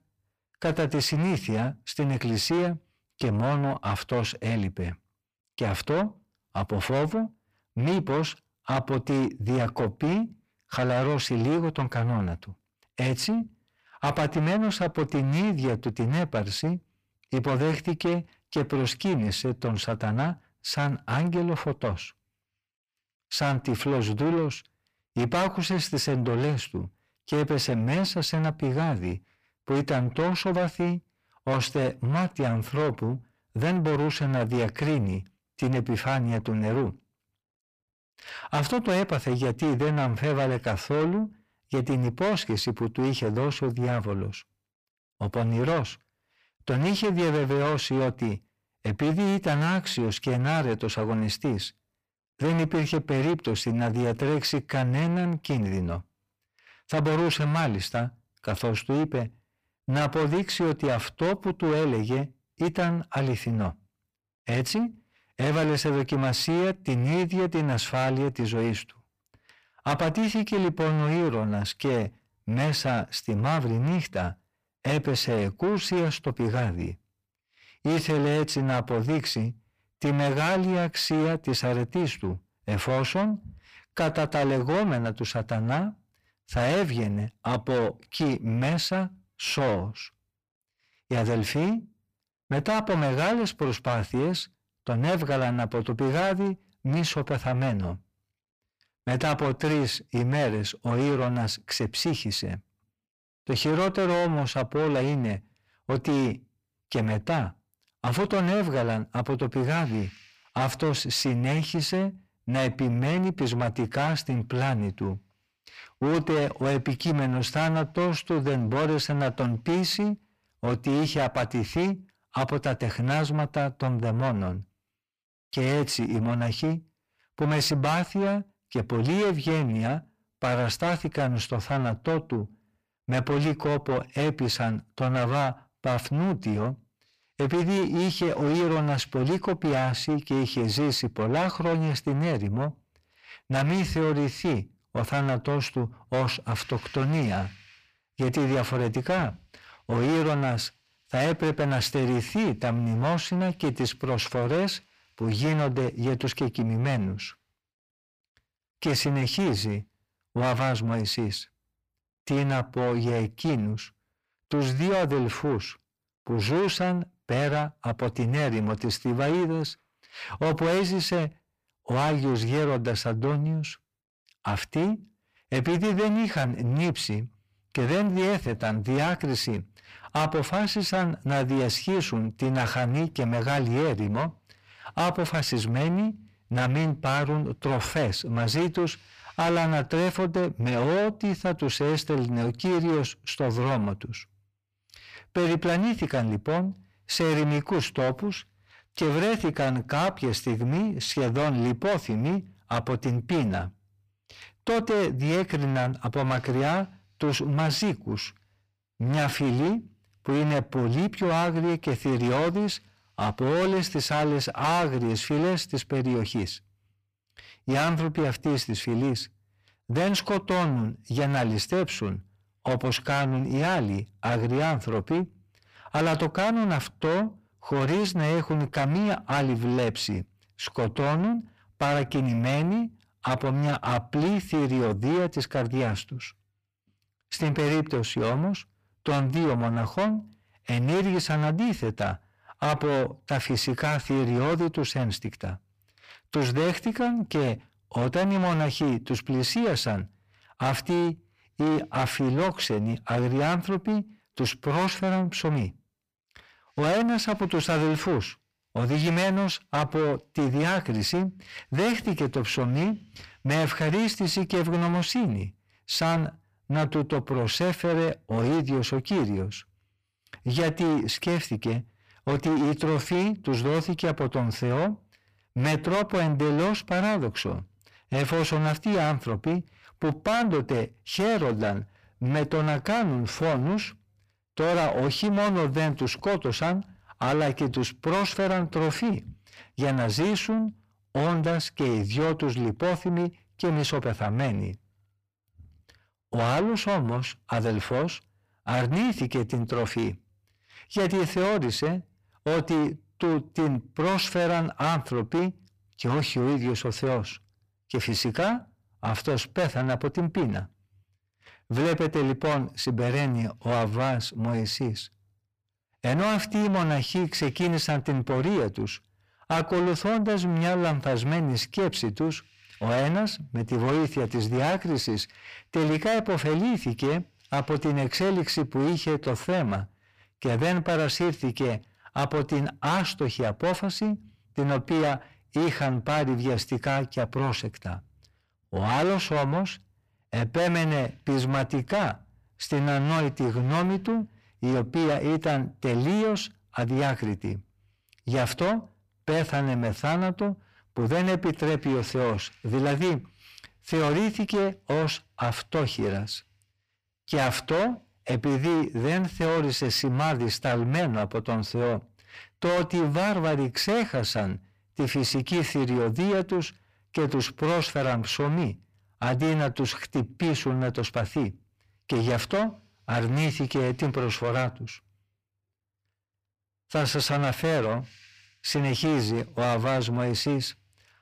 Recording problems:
distortion; heavy; 7 dB below the speech

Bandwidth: 15 kHz